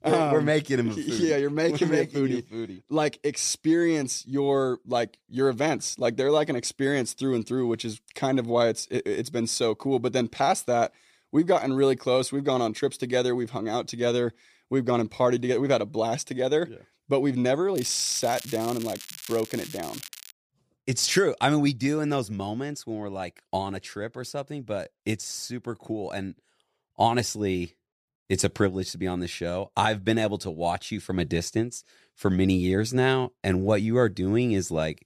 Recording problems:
crackling; noticeable; from 18 to 20 s; 15 dB below the speech

